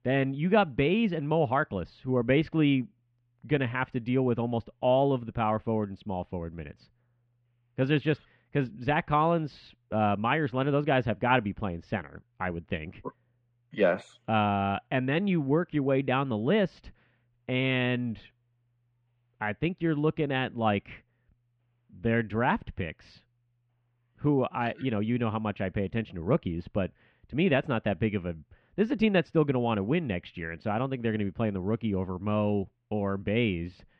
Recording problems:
muffled; very; fading above 3 kHz

